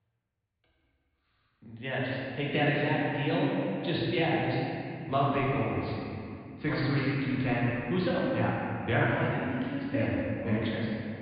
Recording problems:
room echo; strong; dies away in 2.4 s
off-mic speech; far
high frequencies cut off; severe; nothing above 4.5 kHz

